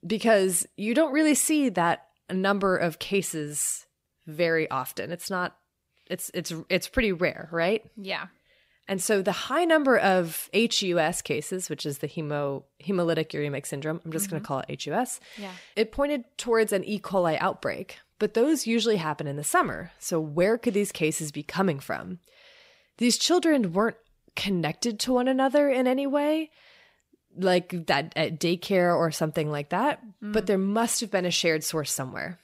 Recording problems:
none

